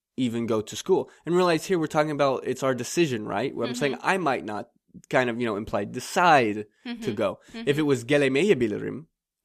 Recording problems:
none

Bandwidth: 14.5 kHz